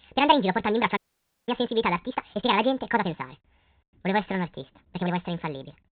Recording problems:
high frequencies cut off; severe; nothing above 4 kHz
wrong speed and pitch; too fast and too high; 1.6 times normal speed
uneven, jittery; strongly; from 1 to 5 s
audio cutting out; at 1 s for 0.5 s

